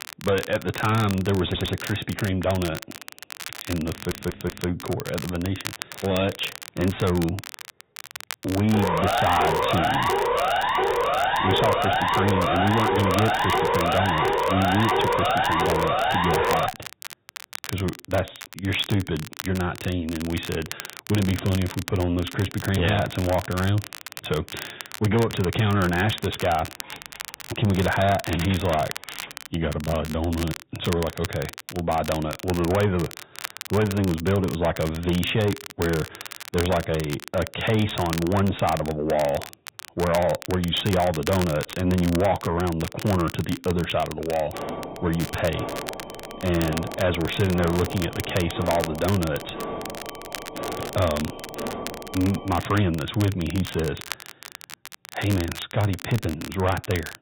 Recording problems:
high frequencies cut off; severe; nothing above 4 kHz
distortion; slight; 10 dB below the speech
garbled, watery; slightly
crackle, like an old record; noticeable; 10 dB below the speech
audio stuttering; at 1.5 s and at 4 s
siren; loud; from 8.5 to 17 s; peak 4 dB above the speech
jangling keys; noticeable; from 26 to 29 s; peak 9 dB below the speech
alarm; noticeable; from 45 to 53 s; peak 7 dB below the speech

